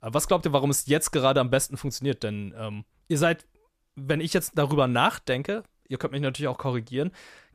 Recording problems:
none

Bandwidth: 14.5 kHz